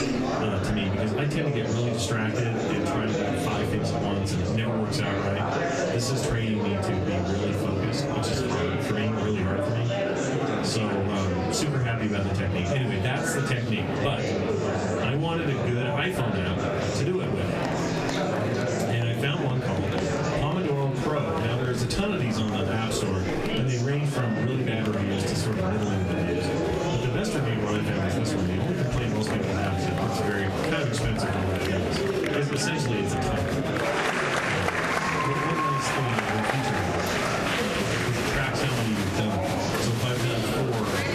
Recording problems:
off-mic speech; far
room echo; very slight; dies away in 0.2 s
squashed, flat; somewhat
murmuring crowd; very loud; throughout; as loud as the speech

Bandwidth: 14 kHz